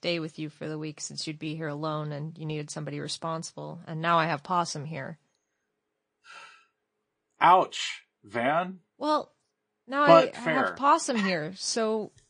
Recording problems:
garbled, watery; slightly; nothing above 9 kHz

